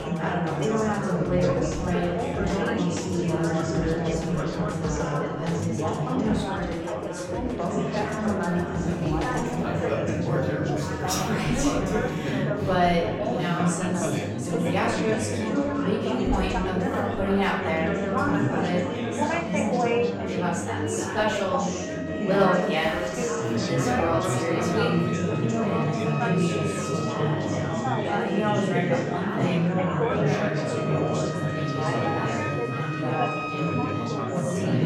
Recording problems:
off-mic speech; far
room echo; noticeable; dies away in 0.7 s
chatter from many people; very loud; throughout; 3 dB above the speech
background music; loud; throughout; 8 dB below the speech

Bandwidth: 16.5 kHz